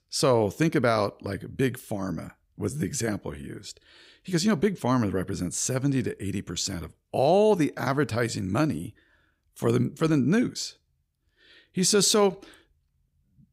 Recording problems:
none

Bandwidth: 15.5 kHz